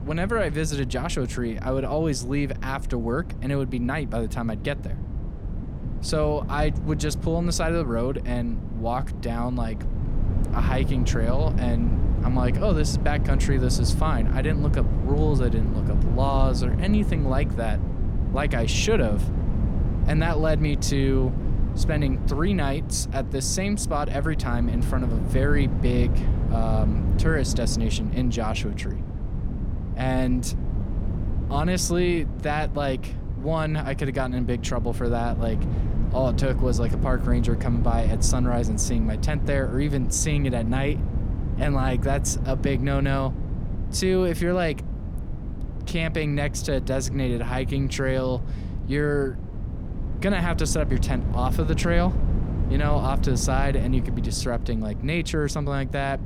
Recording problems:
wind noise on the microphone; occasional gusts; 10 dB below the speech

